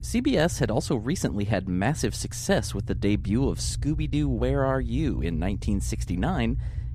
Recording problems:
low rumble; faint; throughout; 20 dB below the speech

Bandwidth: 14.5 kHz